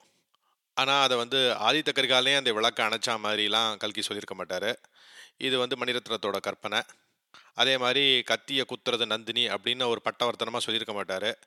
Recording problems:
thin; very; fading below 550 Hz

